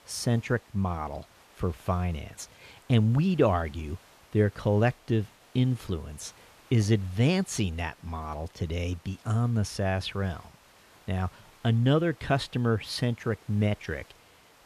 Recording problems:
hiss; faint; throughout; 25 dB below the speech

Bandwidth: 14.5 kHz